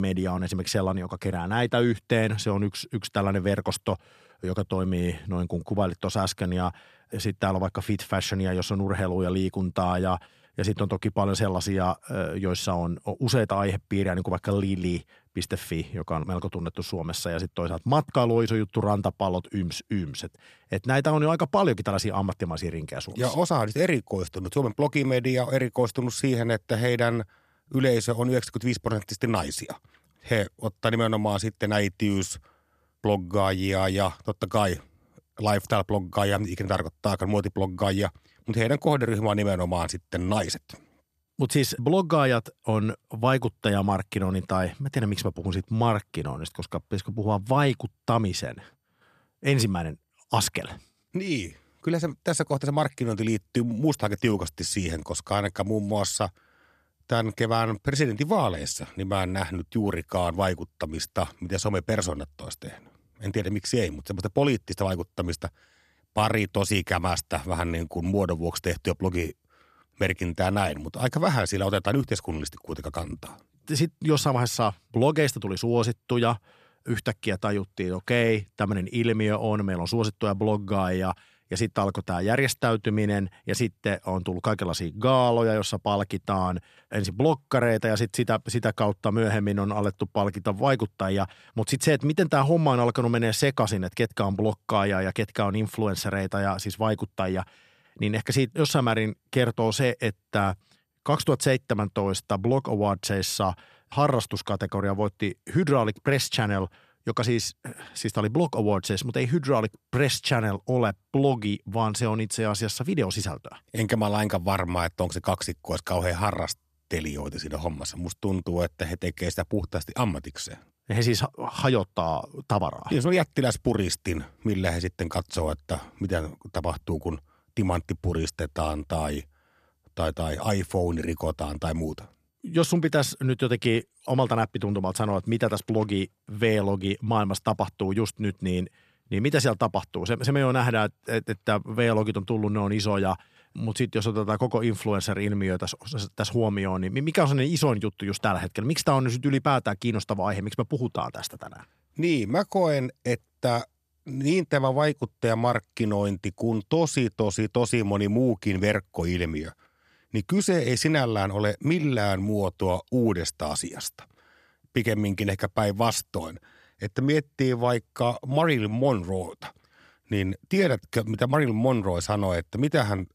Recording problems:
abrupt cut into speech; at the start

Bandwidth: 14 kHz